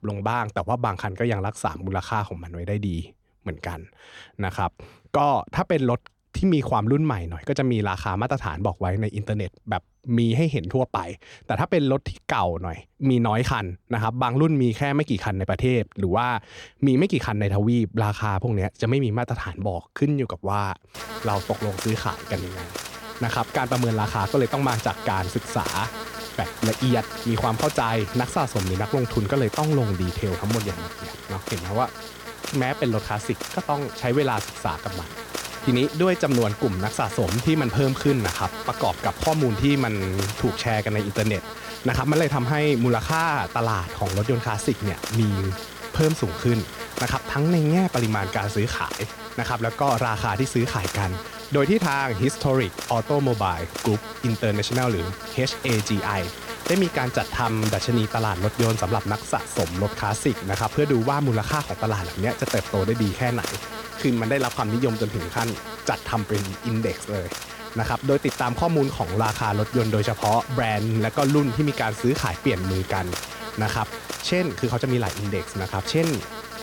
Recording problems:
electrical hum; loud; from 21 s on; 60 Hz, 7 dB below the speech

